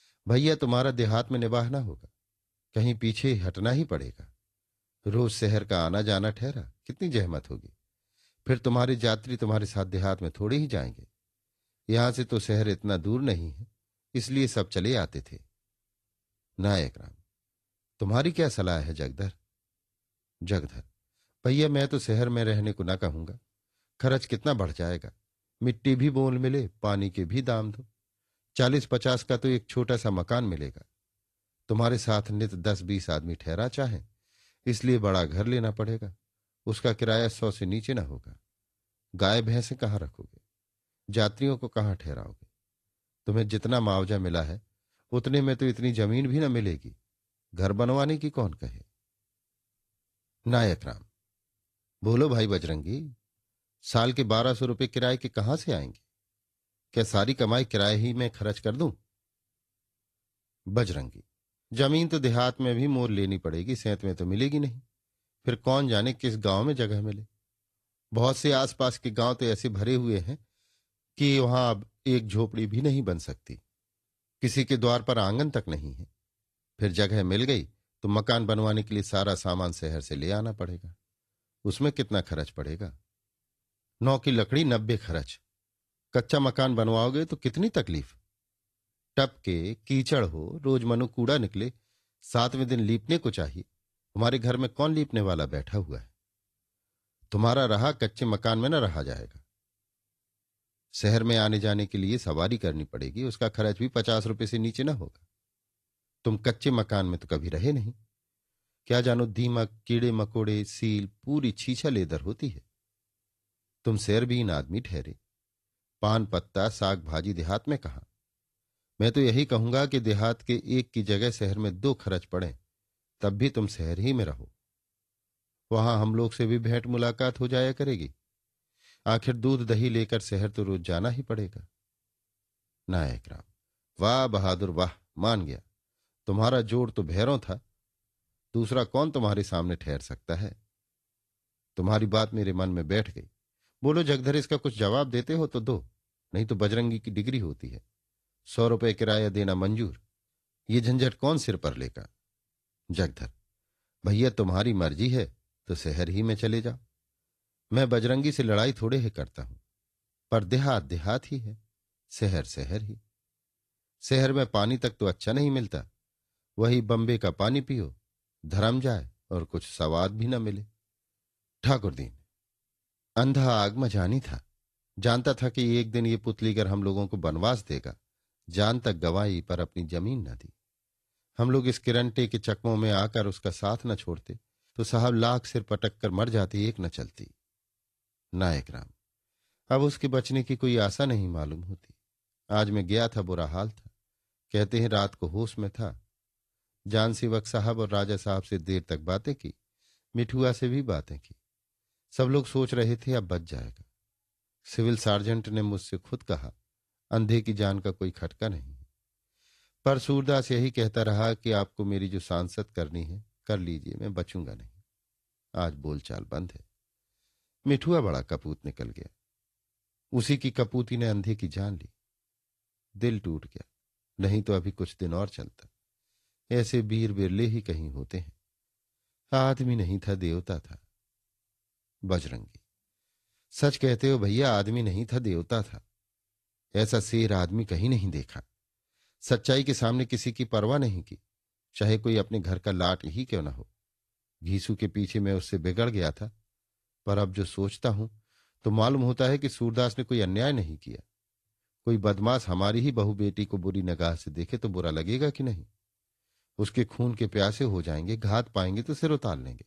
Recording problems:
garbled, watery; slightly

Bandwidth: 13.5 kHz